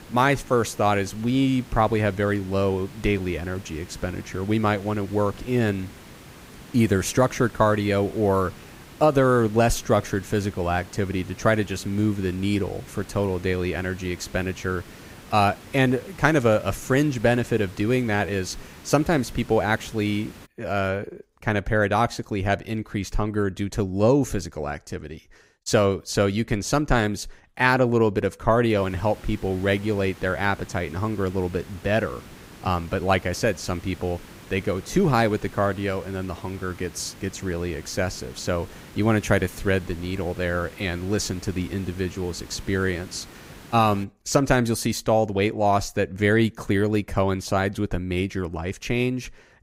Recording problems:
hiss; noticeable; until 20 s and from 29 to 44 s; 20 dB below the speech

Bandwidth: 15.5 kHz